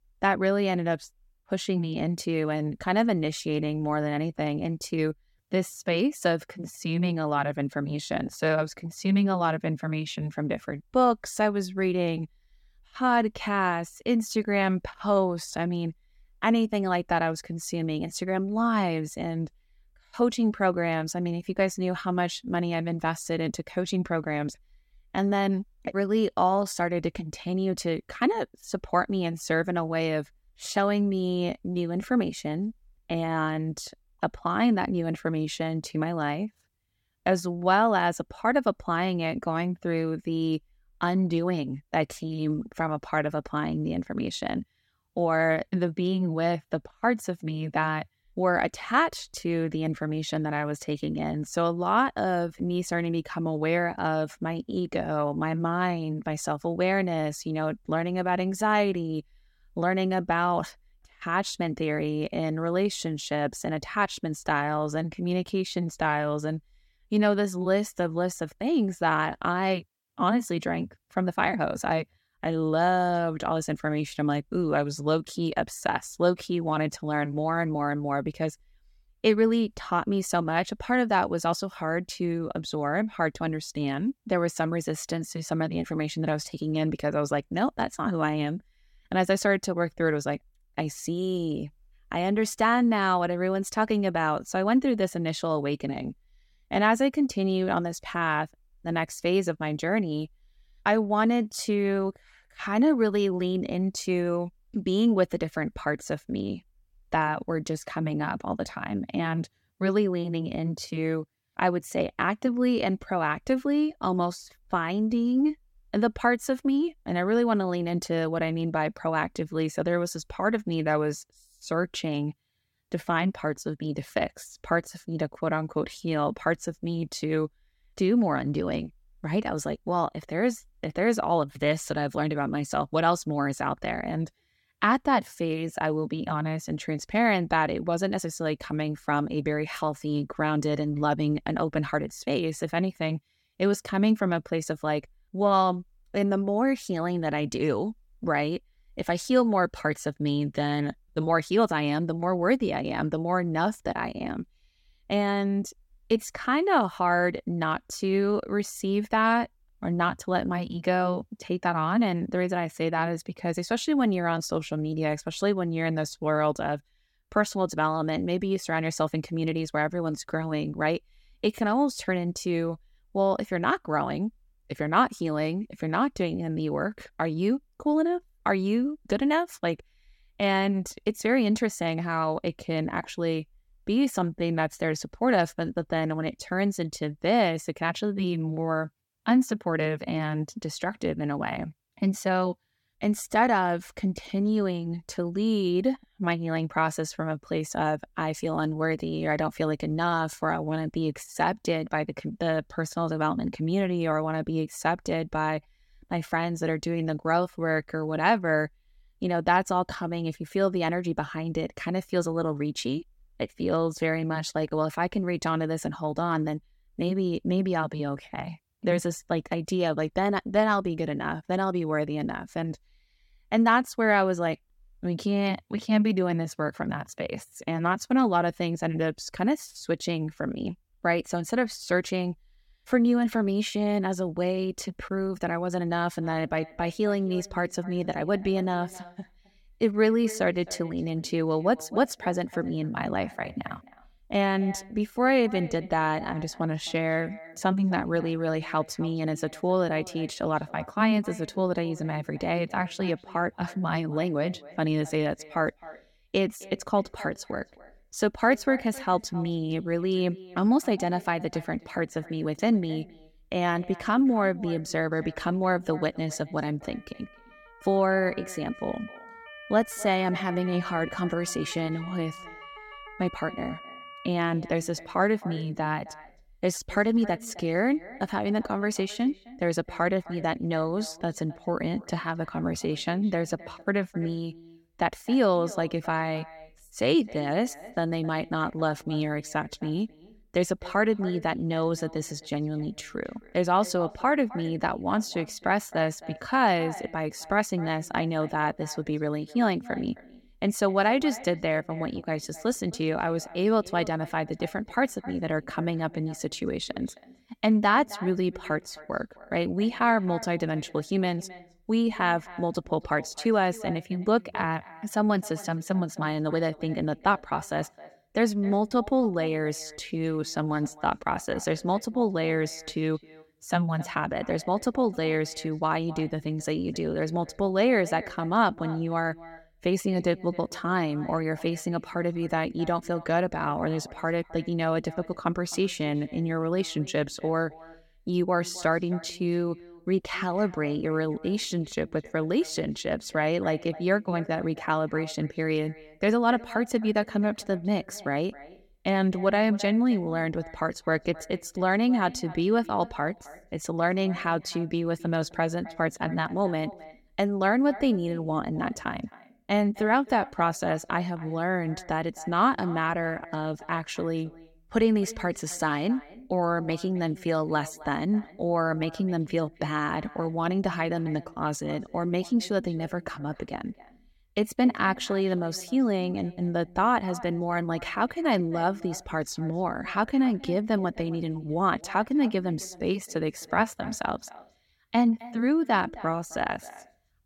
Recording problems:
echo of what is said; faint; from 3:56 on; 260 ms later, 20 dB below the speech
siren; faint; from 4:27 to 4:34; peak 15 dB below the speech

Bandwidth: 17 kHz